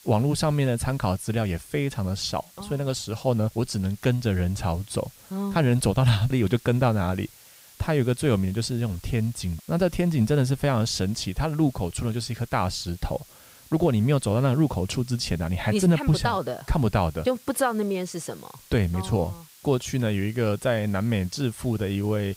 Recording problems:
hiss; faint; throughout; 25 dB below the speech

